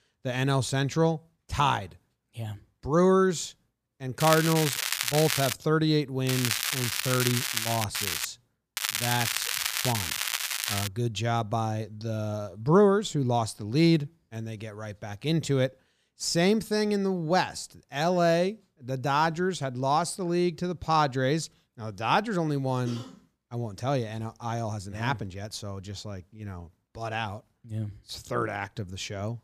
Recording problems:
crackling; loud; 4 times, first at 4 s; 1 dB below the speech

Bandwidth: 15 kHz